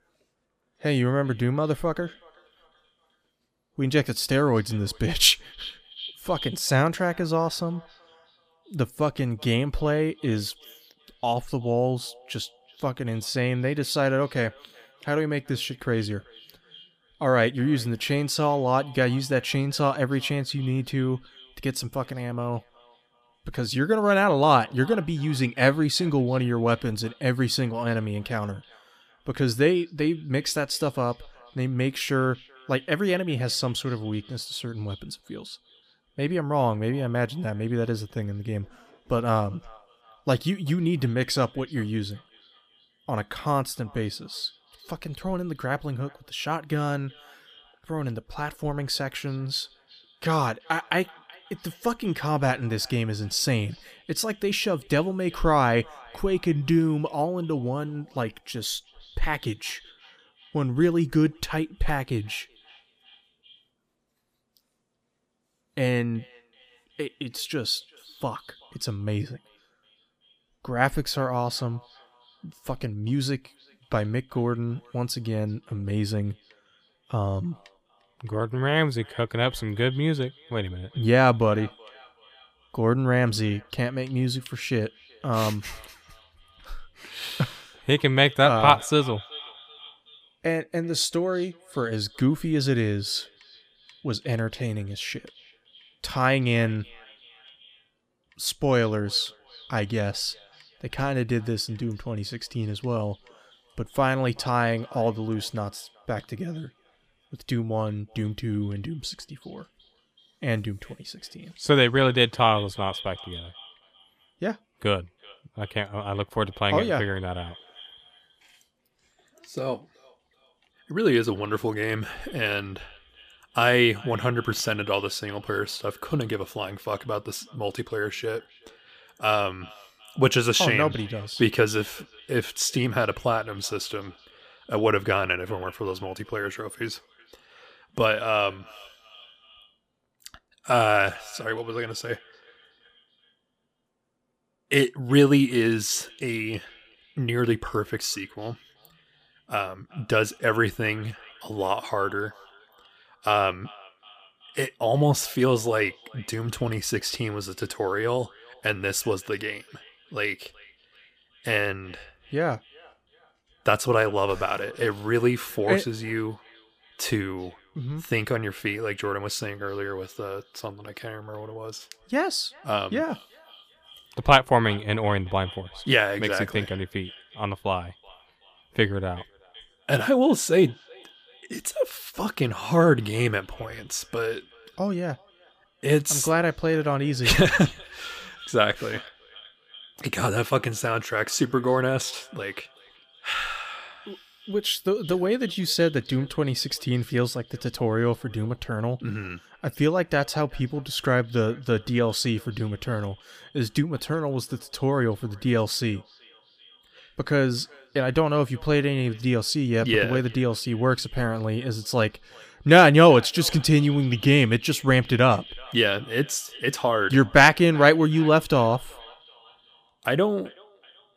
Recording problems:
echo of what is said; faint; throughout; 380 ms later, 25 dB below the speech

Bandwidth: 15 kHz